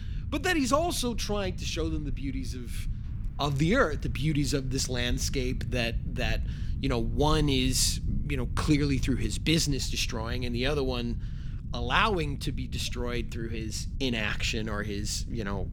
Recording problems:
low rumble; faint; throughout; 20 dB below the speech

